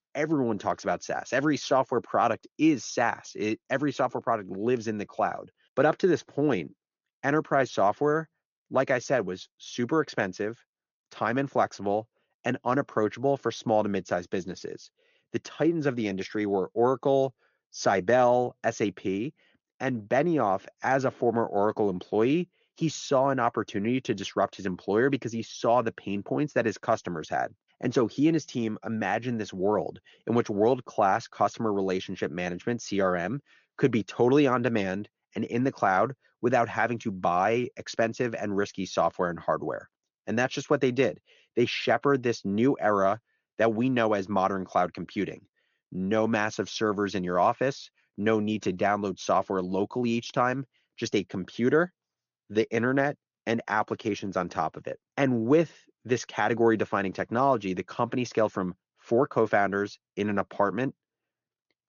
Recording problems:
high frequencies cut off; noticeable; nothing above 7 kHz

